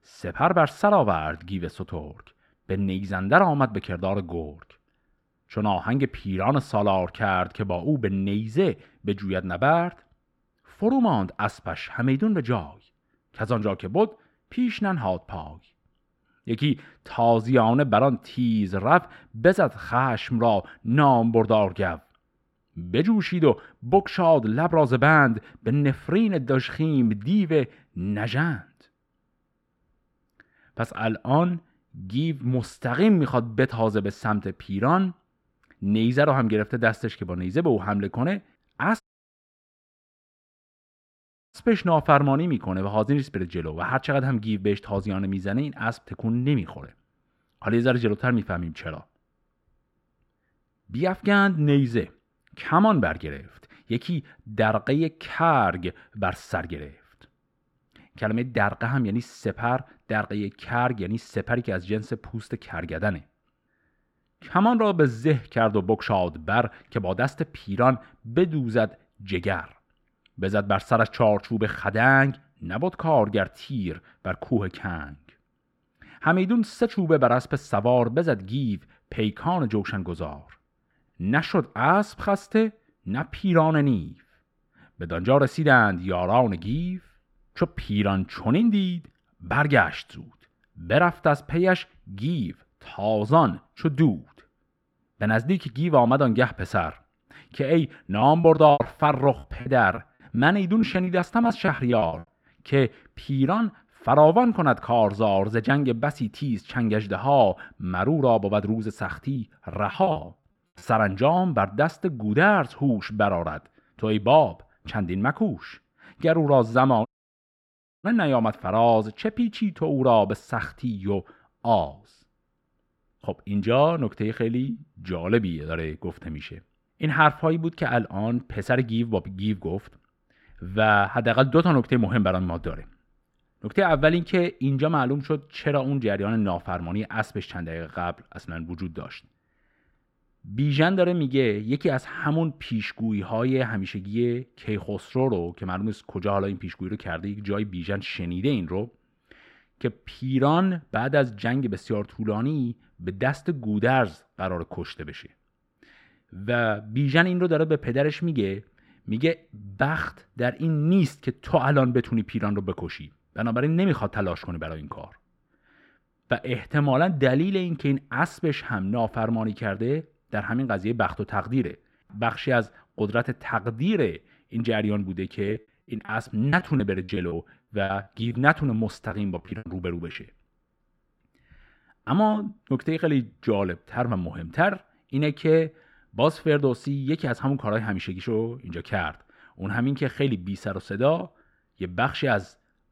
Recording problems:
muffled; slightly; fading above 3.5 kHz
audio cutting out; at 39 s for 2.5 s and at 1:57 for 1 s
choppy; very; from 1:38 to 1:42, from 1:49 to 1:51 and from 2:55 to 3:00; 14% of the speech affected

